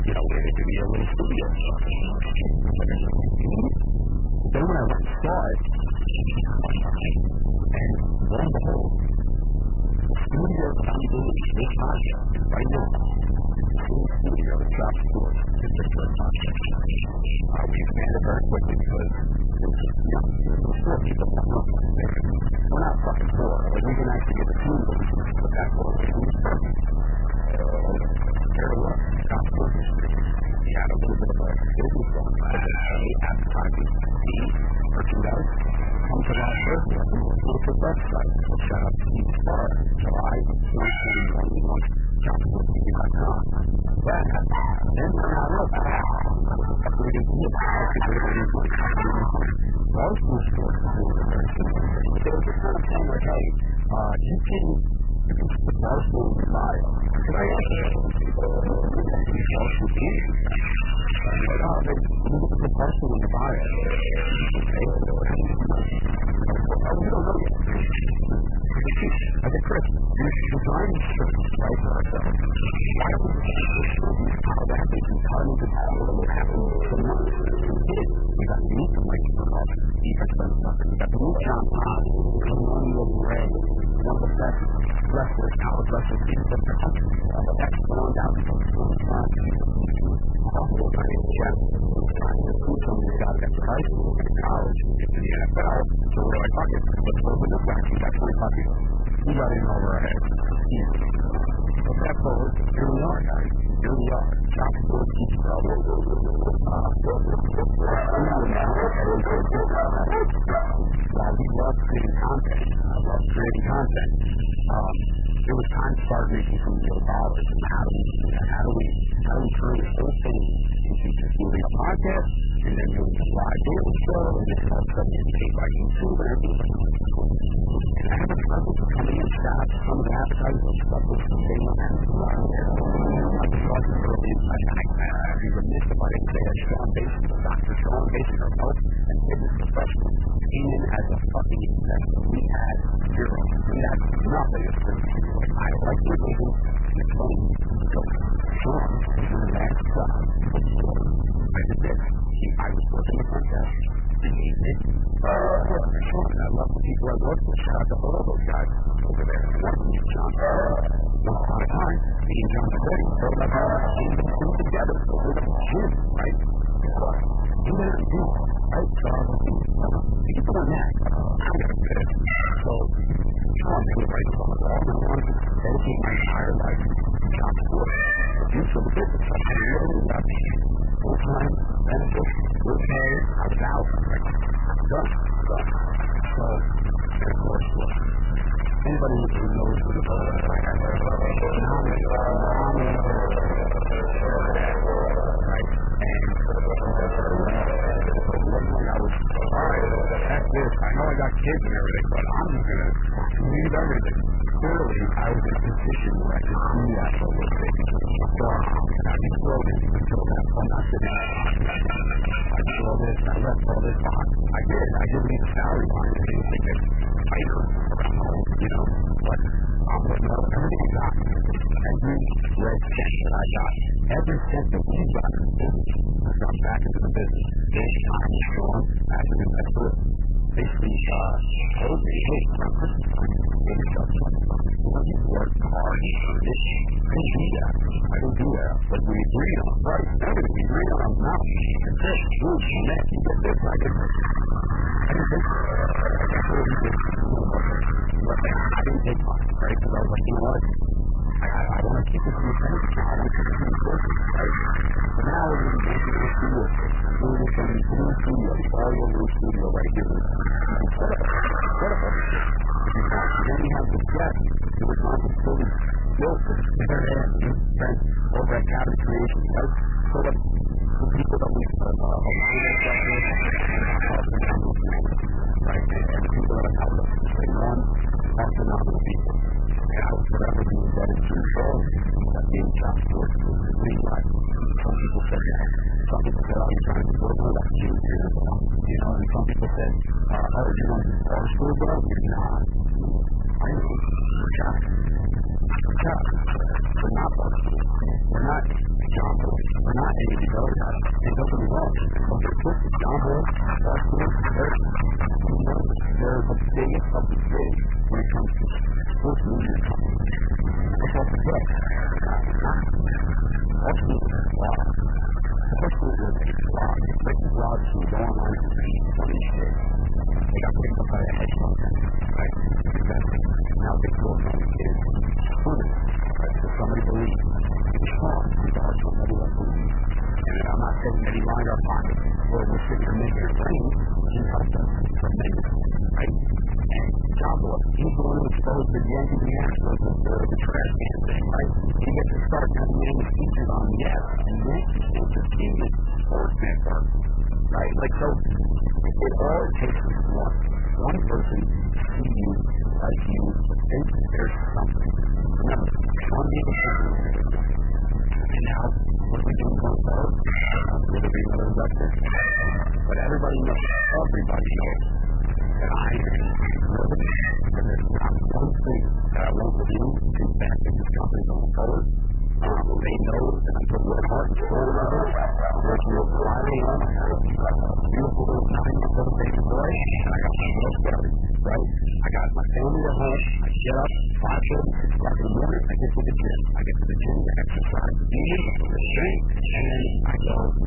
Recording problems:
distortion; heavy; 6 dB below the speech
garbled, watery; badly; nothing above 3 kHz
animal sounds; loud; throughout; 4 dB below the speech
train or aircraft noise; loud; throughout; 10 dB below the speech
low rumble; loud; throughout; 3 dB below the speech

